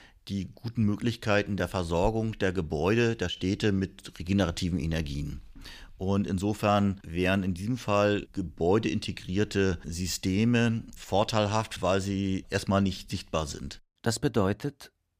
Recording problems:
none

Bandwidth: 15 kHz